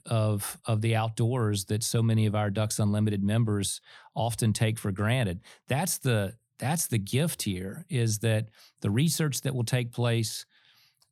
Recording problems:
none

